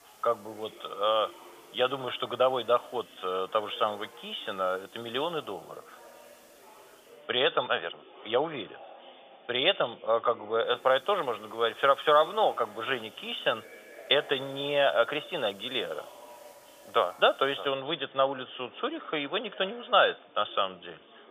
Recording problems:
thin; very; fading below 650 Hz
high frequencies cut off; severe; nothing above 3.5 kHz
chatter from many people; faint; throughout; 25 dB below the speech
hiss; faint; until 7 s and from 11 to 18 s; 30 dB below the speech

